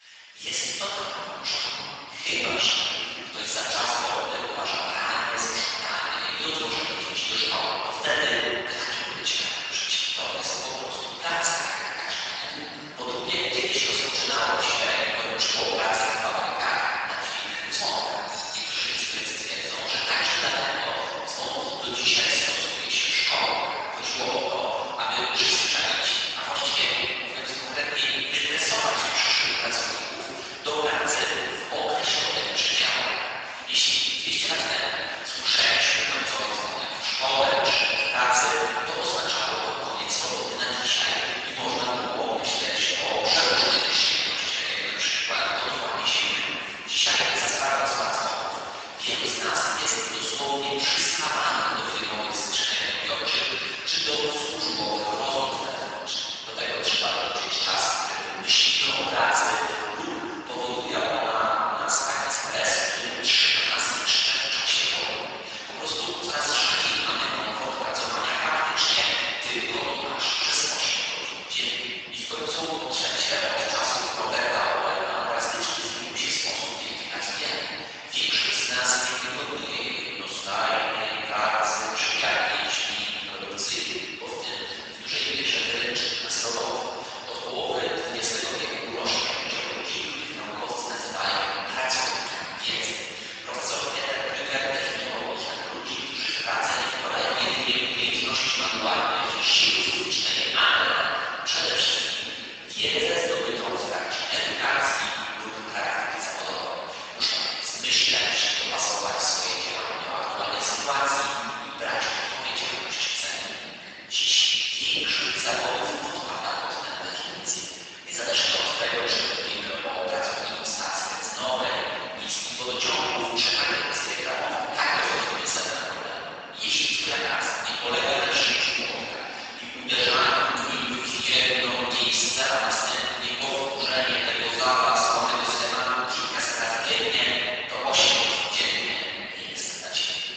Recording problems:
room echo; strong; dies away in 3 s
off-mic speech; far
garbled, watery; badly; nothing above 7.5 kHz
thin; very; fading below 850 Hz

